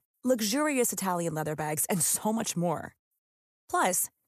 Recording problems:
none

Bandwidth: 14.5 kHz